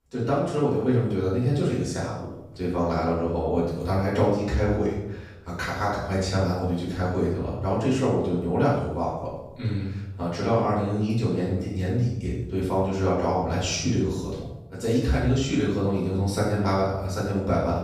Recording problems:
off-mic speech; far
room echo; noticeable; dies away in 0.7 s

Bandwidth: 15.5 kHz